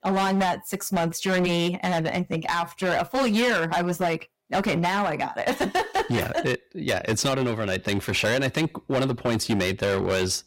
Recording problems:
distortion; heavy; 15% of the sound clipped

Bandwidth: 16 kHz